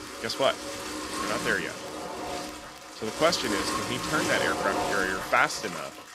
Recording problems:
household noises; loud; throughout; 4 dB below the speech
crackle, like an old record; faint; 30 dB below the speech

